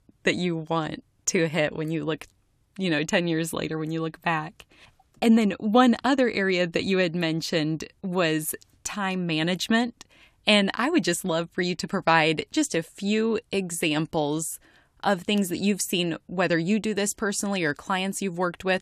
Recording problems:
none

